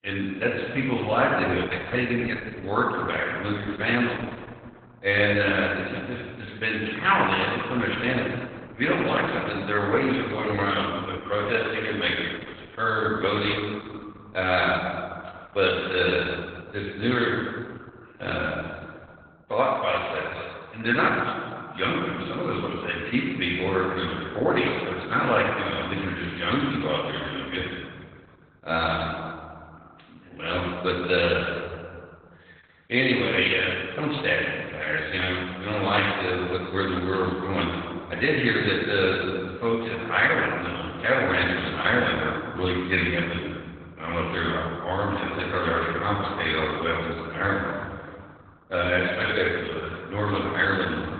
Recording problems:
garbled, watery; badly; nothing above 4 kHz
room echo; noticeable; dies away in 1.8 s
thin; somewhat; fading below 750 Hz
off-mic speech; somewhat distant

